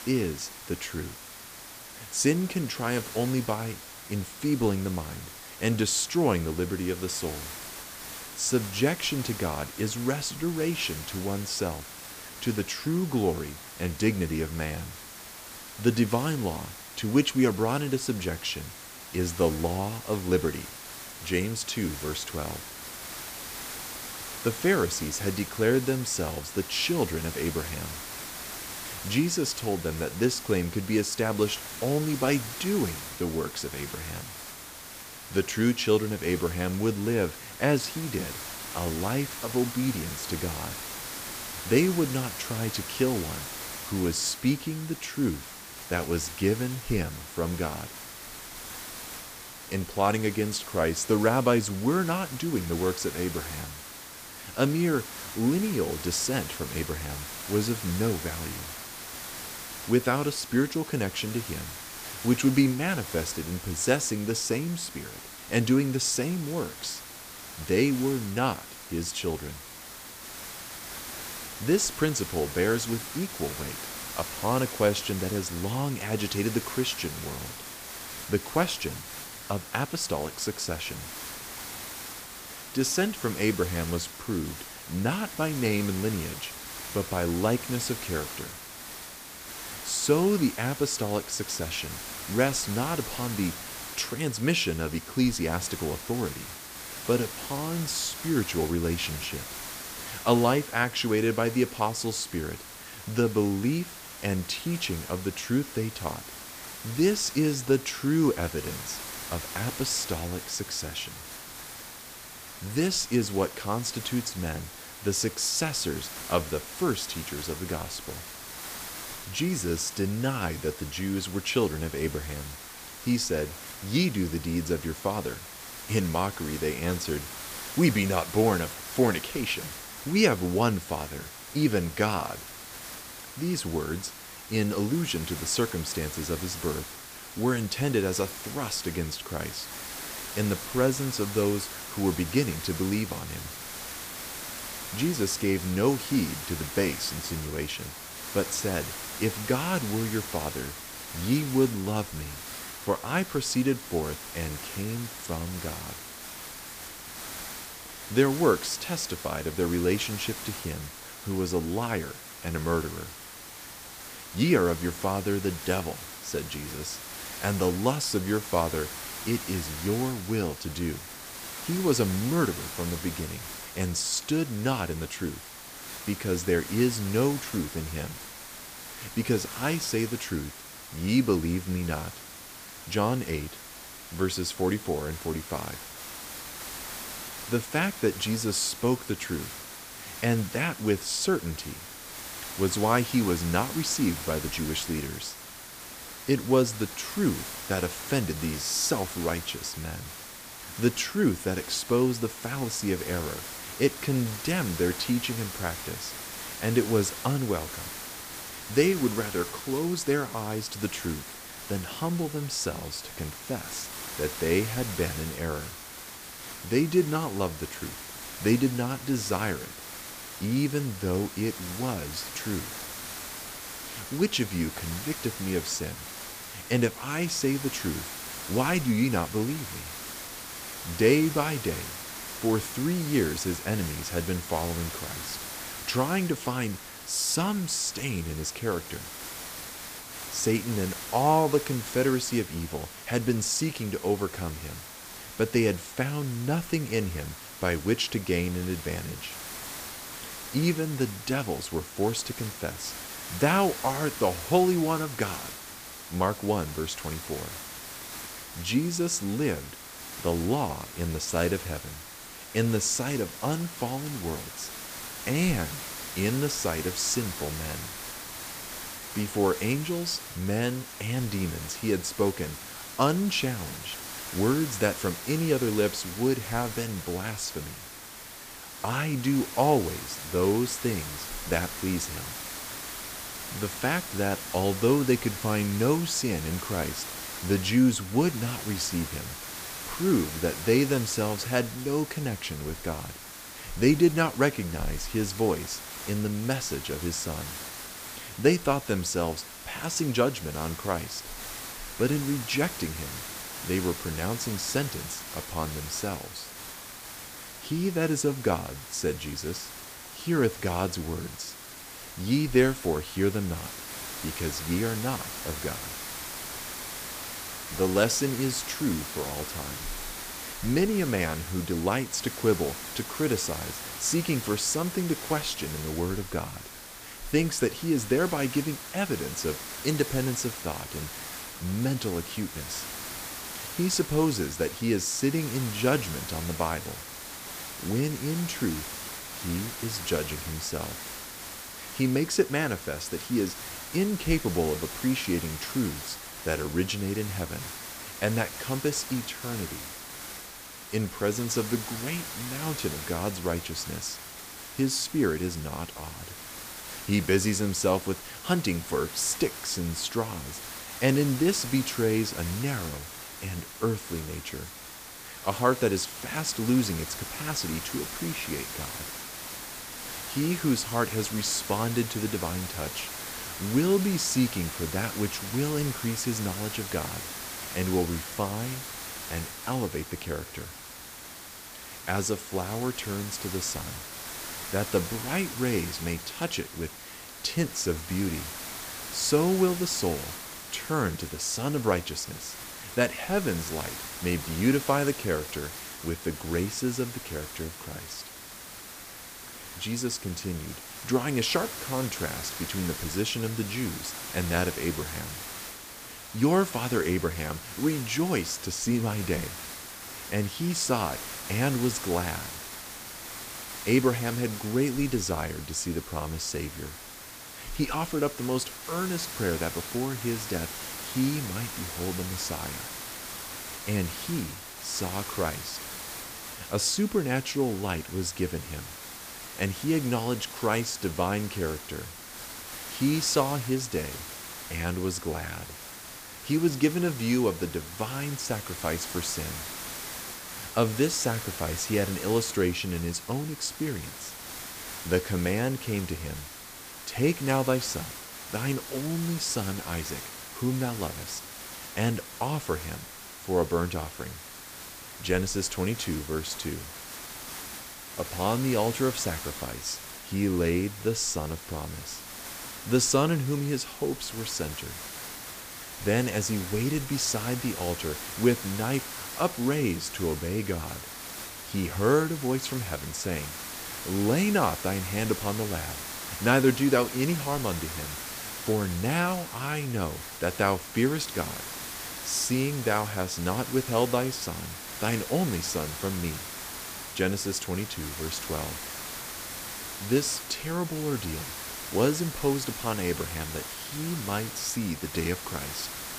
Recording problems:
hiss; loud; throughout; 9 dB below the speech

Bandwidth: 15 kHz